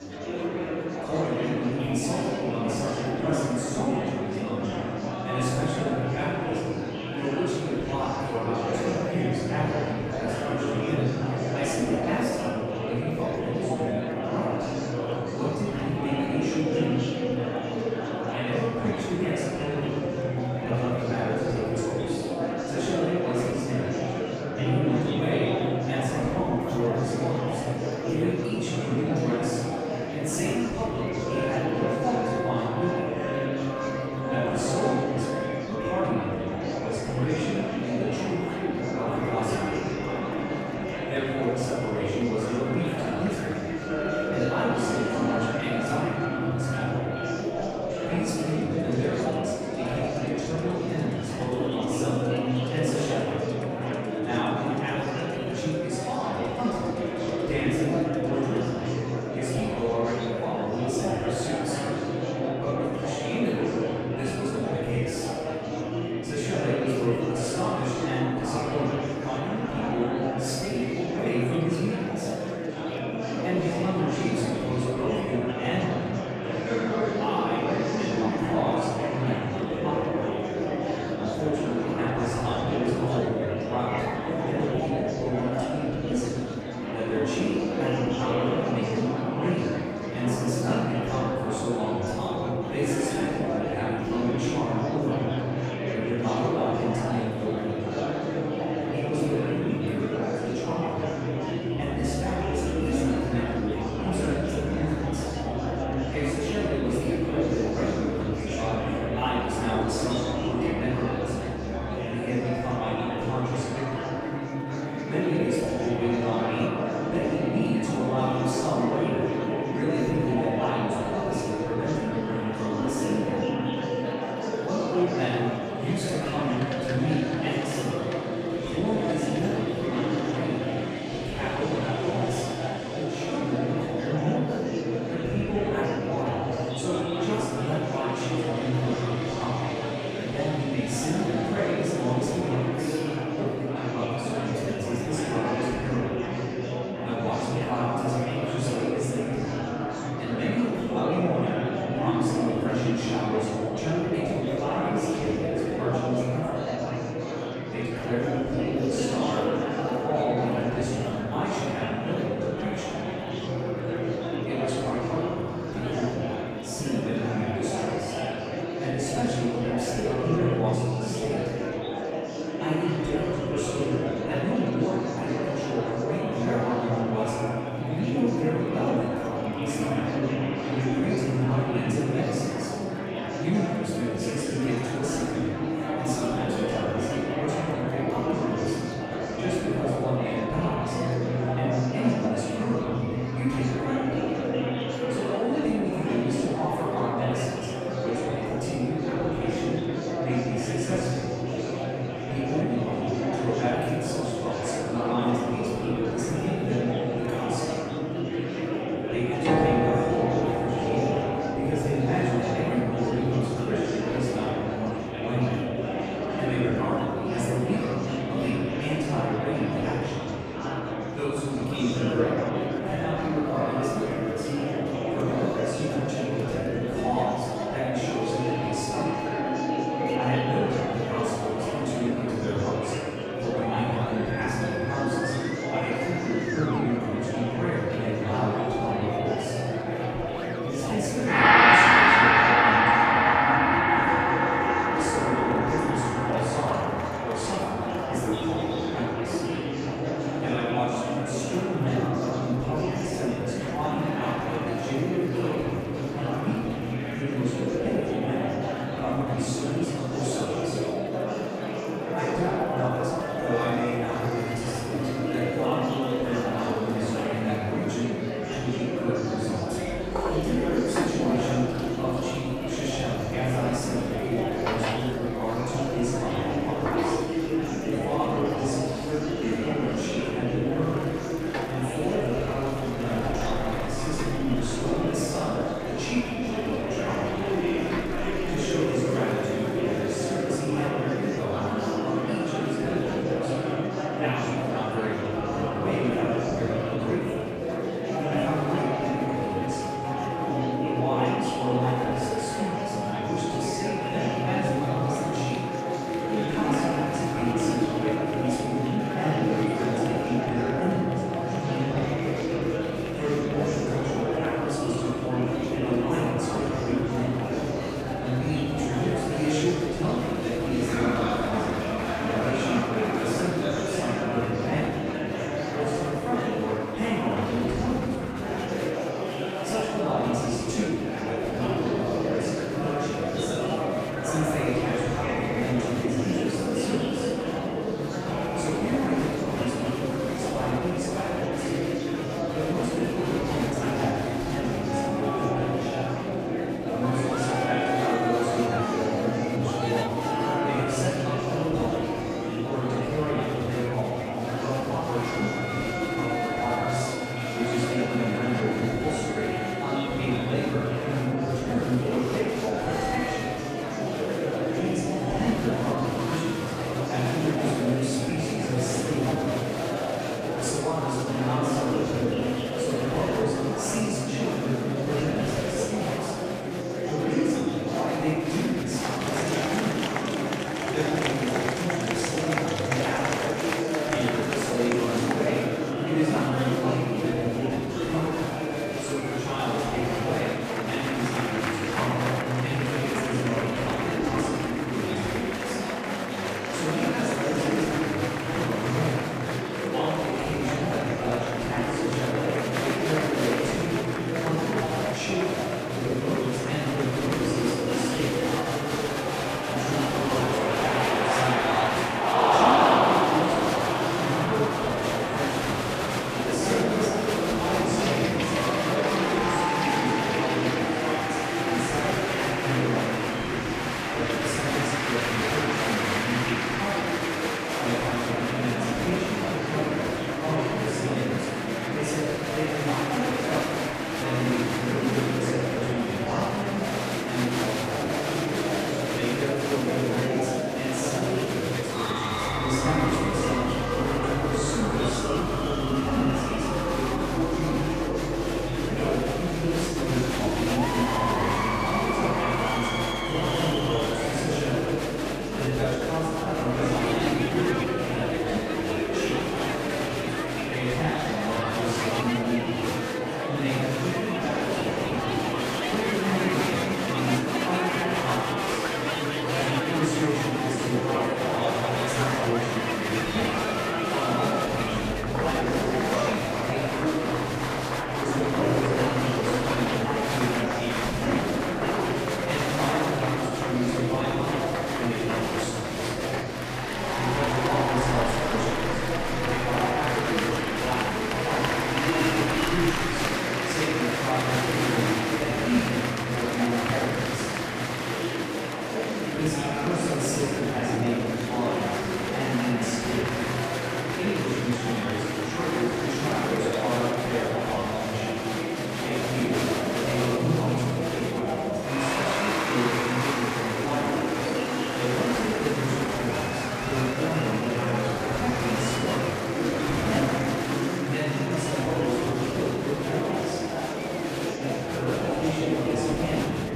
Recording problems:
room echo; strong; dies away in 2 s
off-mic speech; far
murmuring crowd; very loud; throughout; 1 dB above the speech
background music; loud; throughout; 5 dB below the speech

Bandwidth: 14.5 kHz